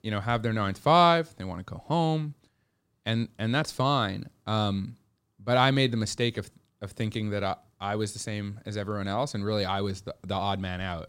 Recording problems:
none

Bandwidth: 16 kHz